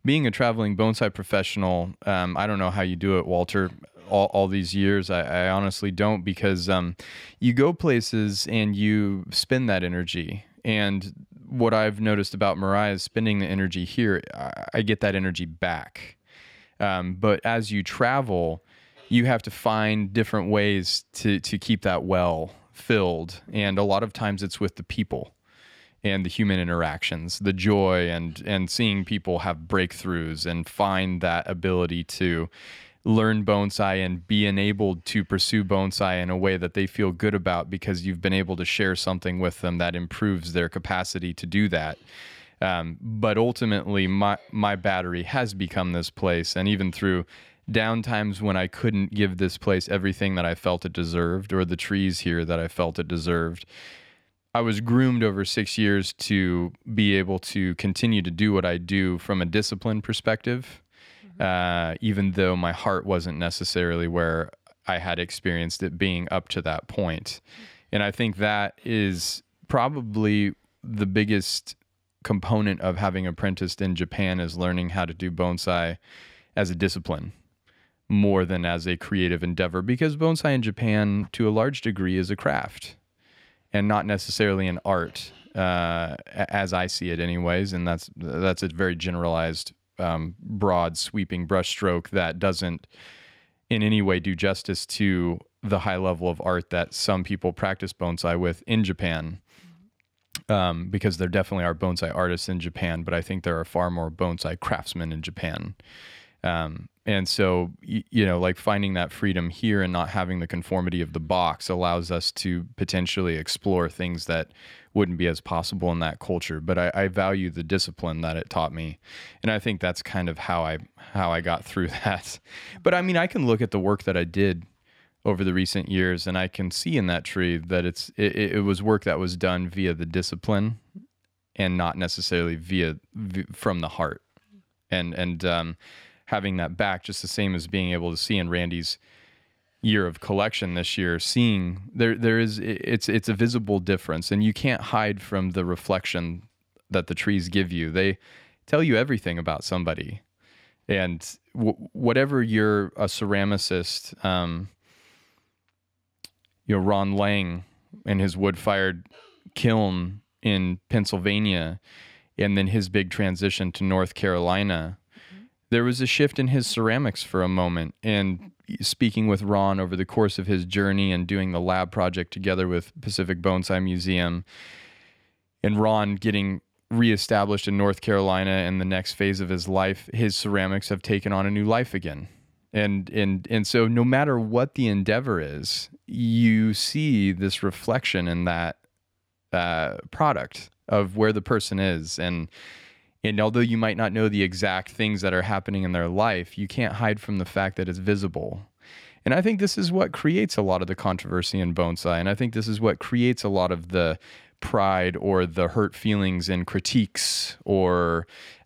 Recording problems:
none

